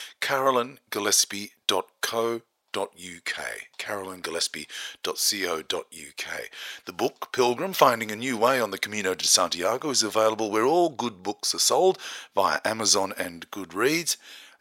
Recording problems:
thin; very; fading below 650 Hz

